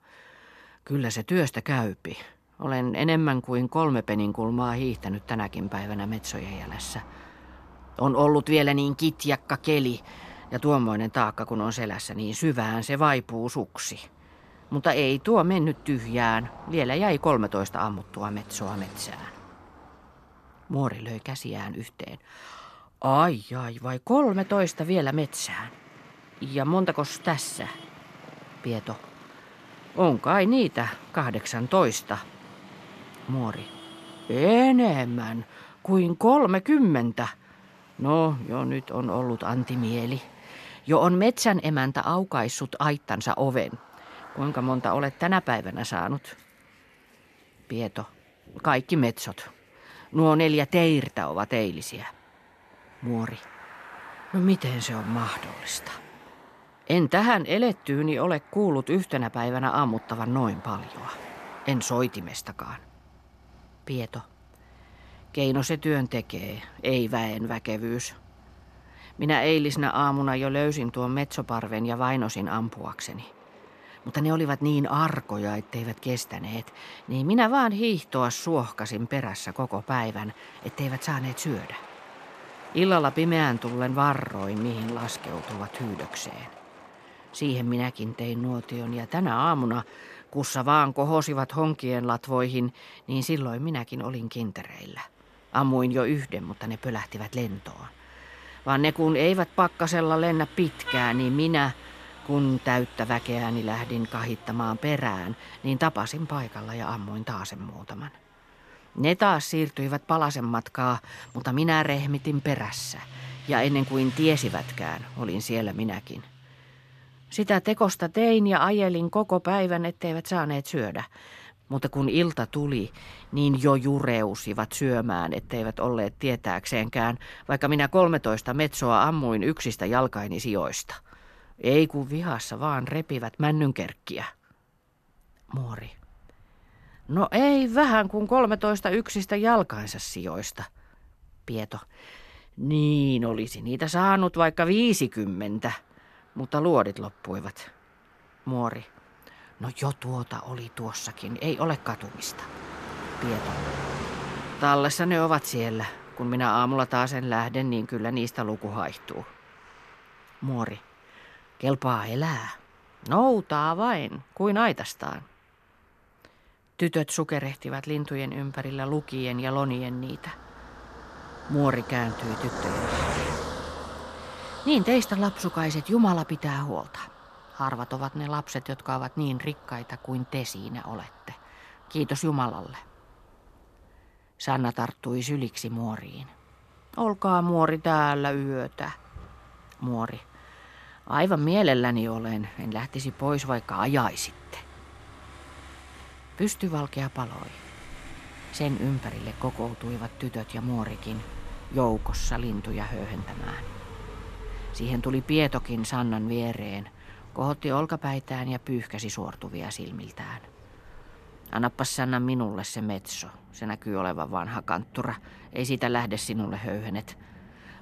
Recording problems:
traffic noise; noticeable; throughout; 20 dB below the speech

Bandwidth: 14 kHz